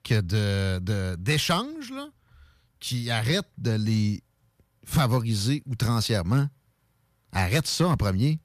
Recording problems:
none

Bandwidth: 14.5 kHz